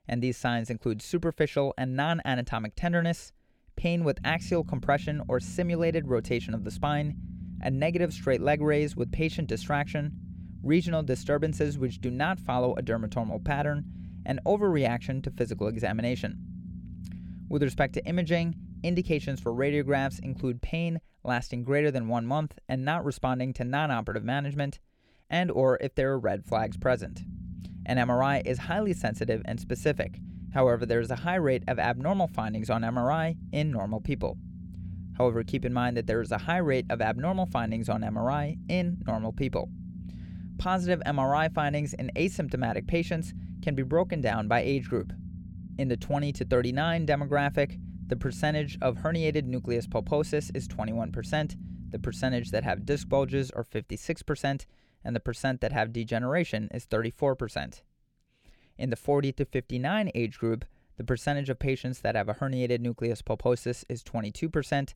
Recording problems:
low rumble; faint; from 4 to 20 s and from 26 to 53 s; 20 dB below the speech

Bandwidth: 17 kHz